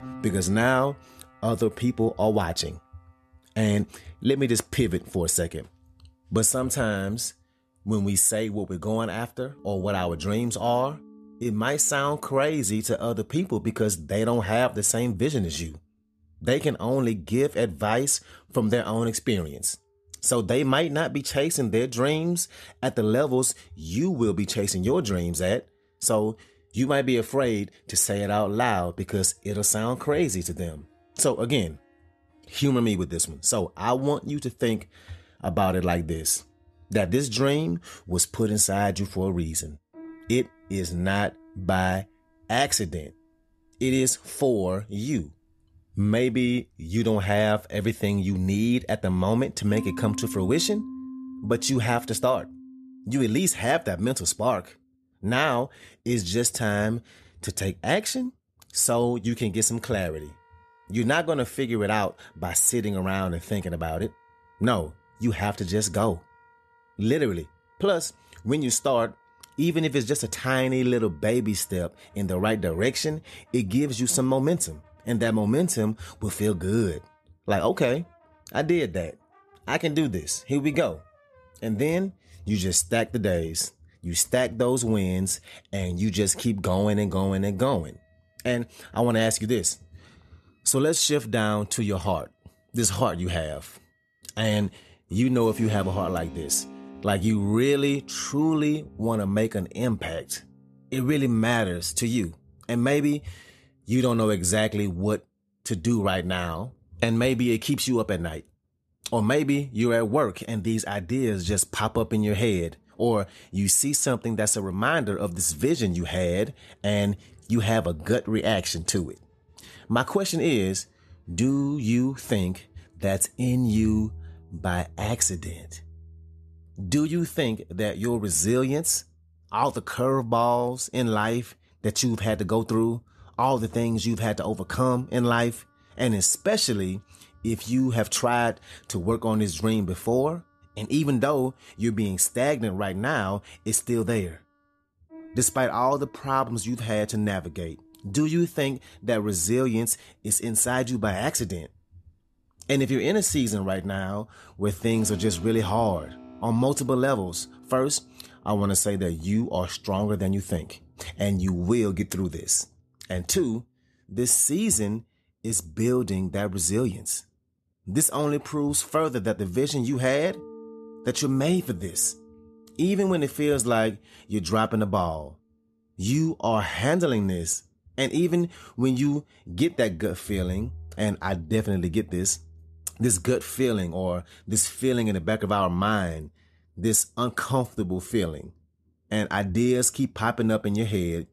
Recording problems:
background music; faint; throughout; 20 dB below the speech

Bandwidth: 13.5 kHz